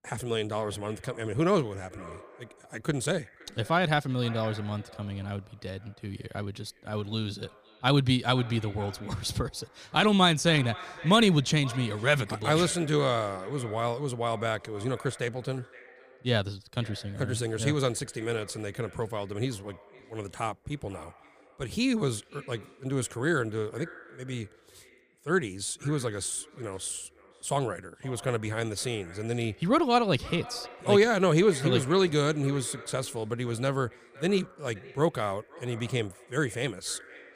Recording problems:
echo of what is said; faint; throughout; 520 ms later, 20 dB below the speech

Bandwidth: 15 kHz